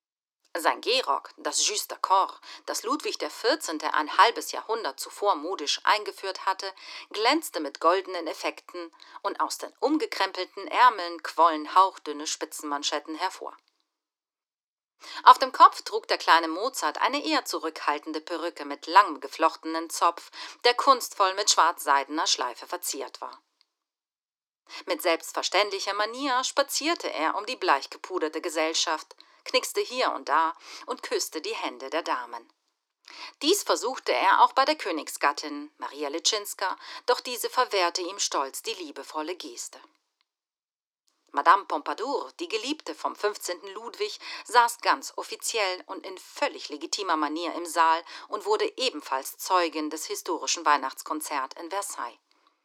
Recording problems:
thin; very; fading below 300 Hz

